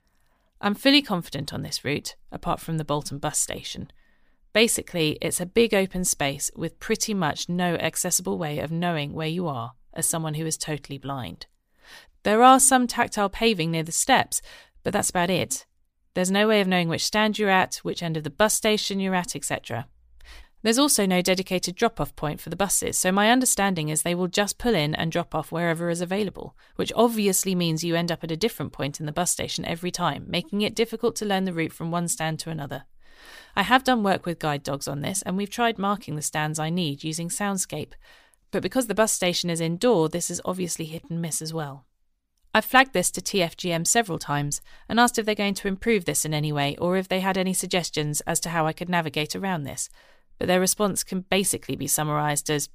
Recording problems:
none

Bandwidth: 15 kHz